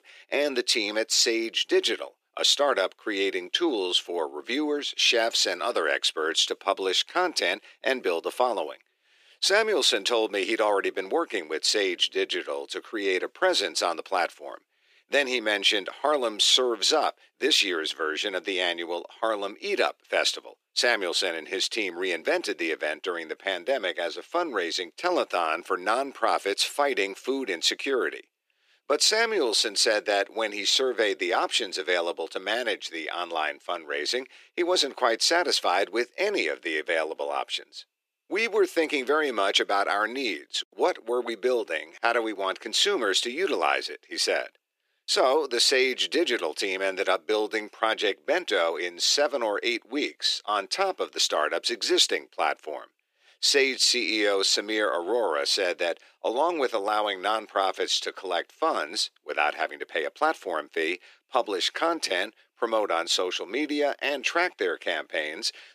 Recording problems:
thin; very; fading below 300 Hz

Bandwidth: 15 kHz